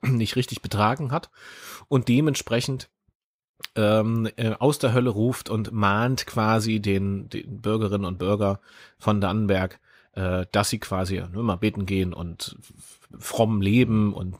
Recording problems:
none

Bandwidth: 15.5 kHz